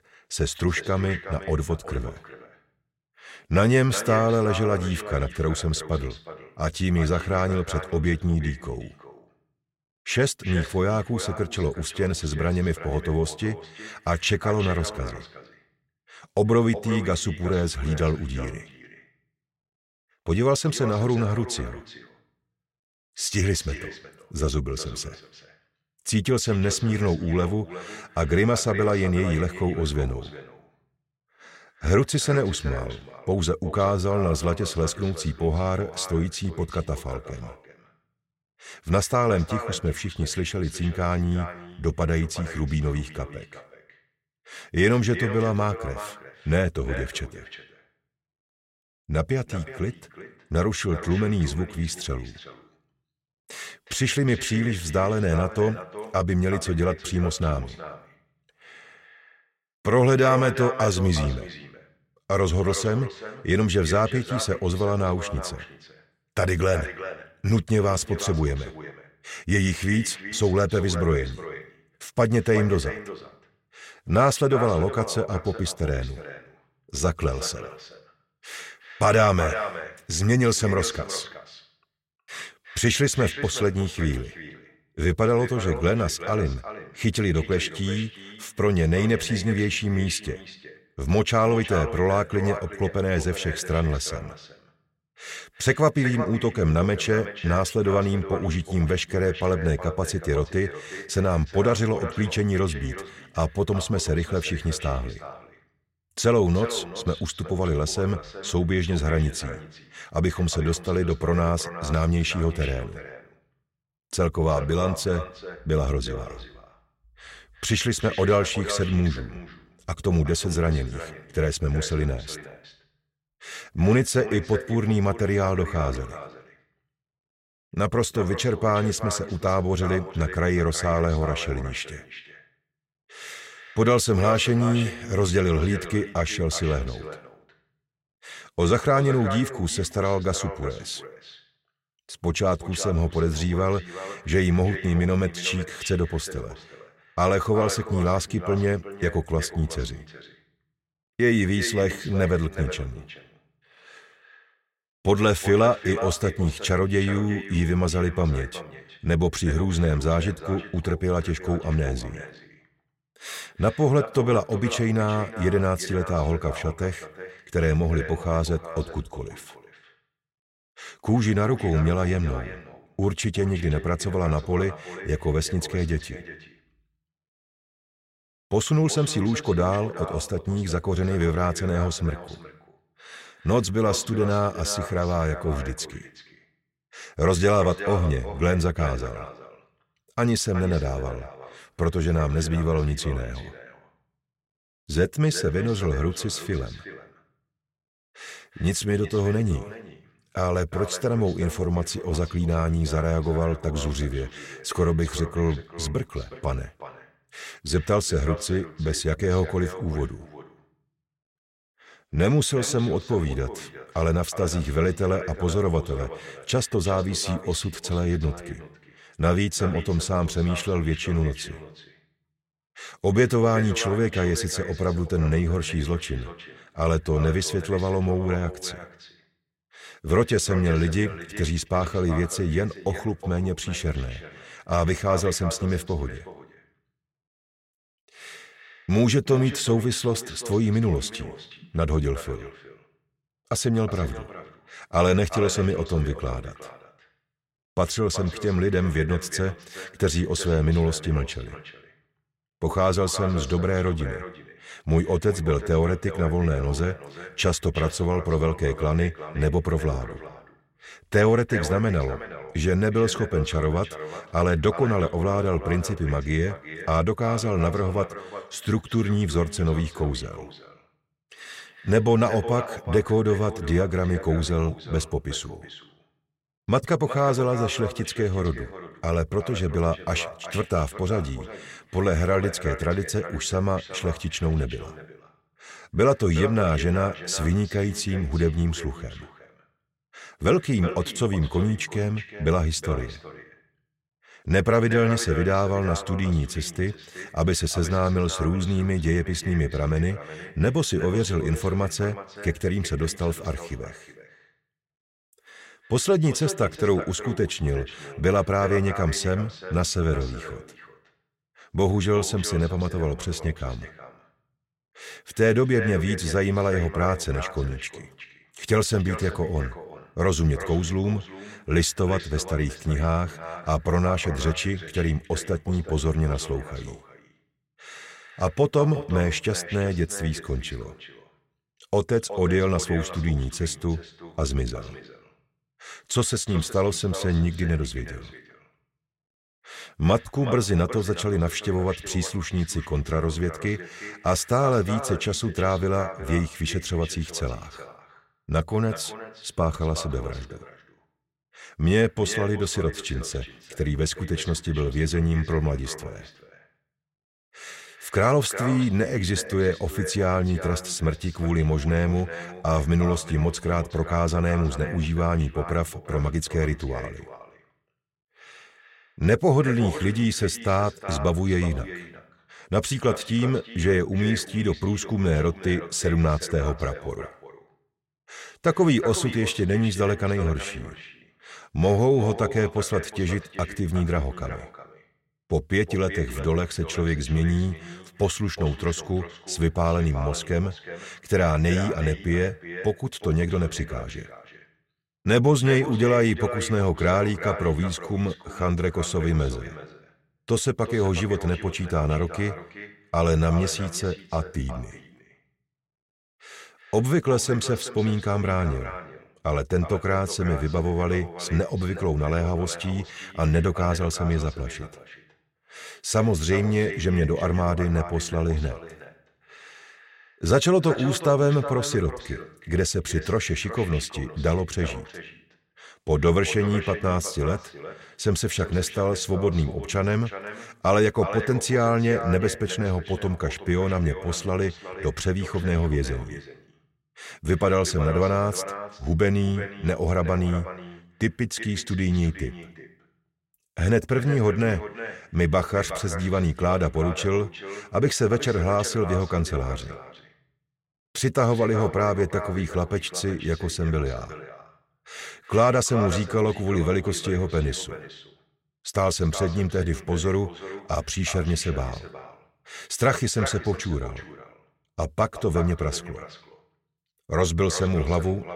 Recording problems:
echo of what is said; noticeable; throughout; 370 ms later, 15 dB below the speech

